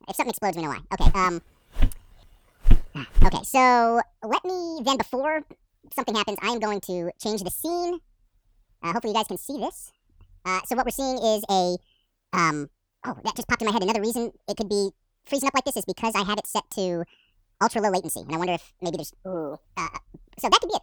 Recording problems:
wrong speed and pitch; too fast and too high; 1.7 times normal speed
footsteps; loud; from 1 to 3.5 s; peak 1 dB above the speech

